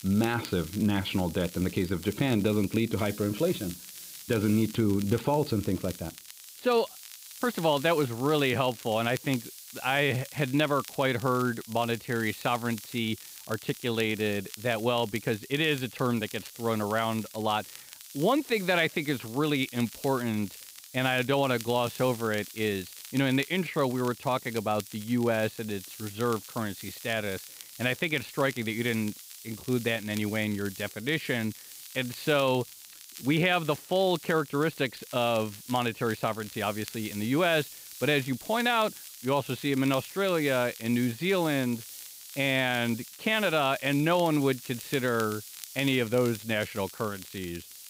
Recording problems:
high frequencies cut off; severe; nothing above 5 kHz
hiss; noticeable; throughout; 15 dB below the speech
crackle, like an old record; noticeable; 20 dB below the speech

